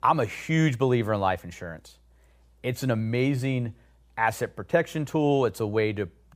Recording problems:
none

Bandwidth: 15.5 kHz